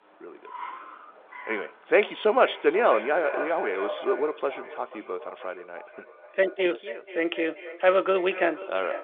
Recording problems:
echo of what is said; strong; throughout; 480 ms later, 10 dB below the speech
phone-call audio; nothing above 3.5 kHz
traffic noise; noticeable; throughout; 15 dB below the speech

